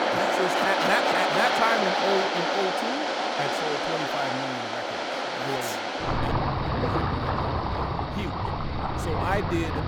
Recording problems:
rain or running water; very loud; throughout; 4 dB above the speech

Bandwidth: 19 kHz